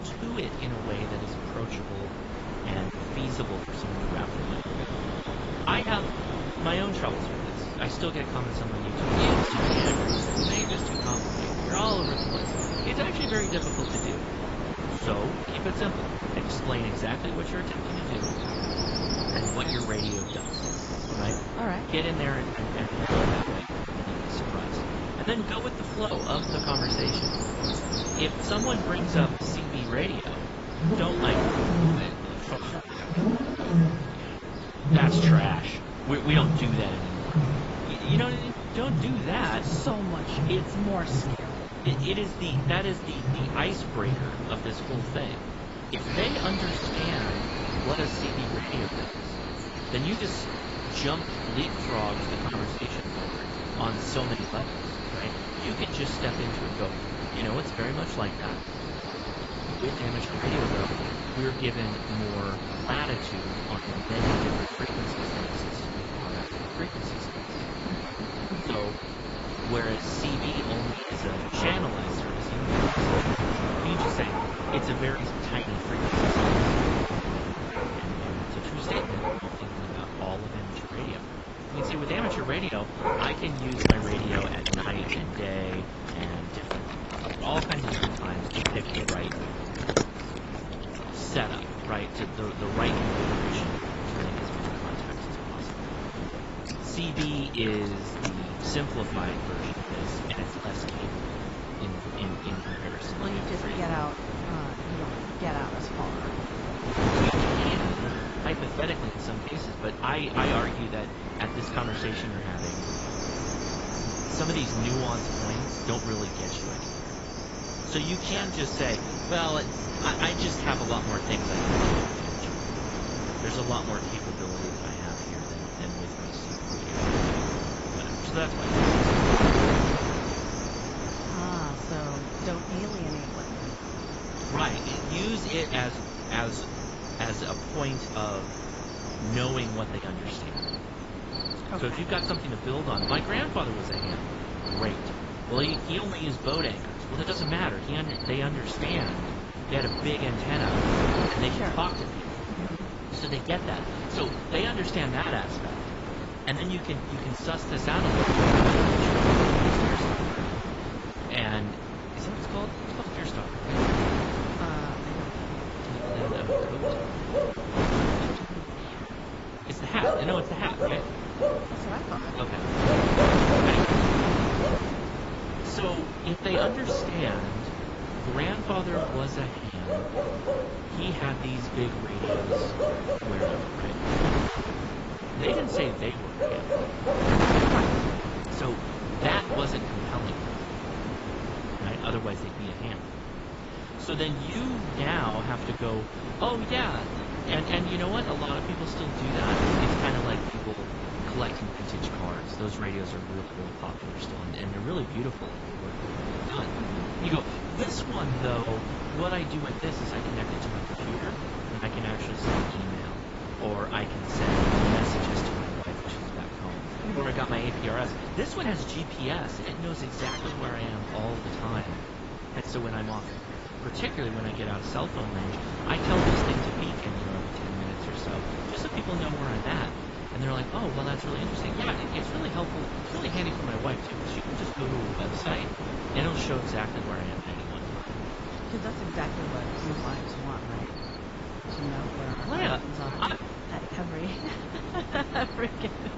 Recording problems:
garbled, watery; badly; nothing above 7.5 kHz
wind noise on the microphone; heavy; 1 dB above the speech
animal sounds; loud; throughout; 1 dB below the speech

